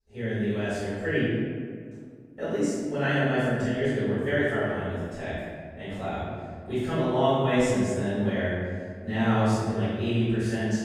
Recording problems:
room echo; strong; dies away in 1.8 s
off-mic speech; far

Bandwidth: 15 kHz